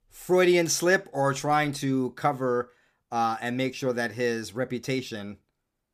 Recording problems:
none

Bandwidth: 15 kHz